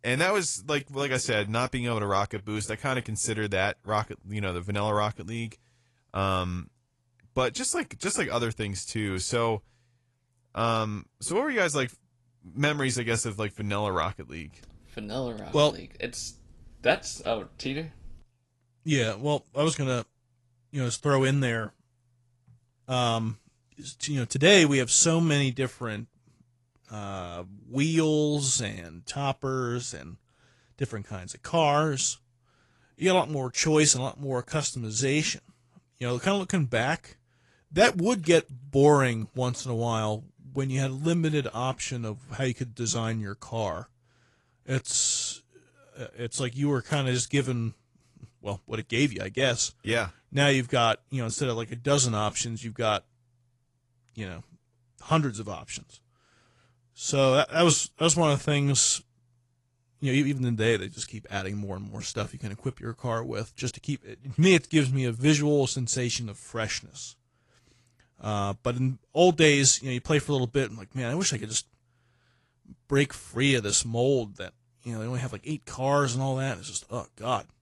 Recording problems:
garbled, watery; slightly

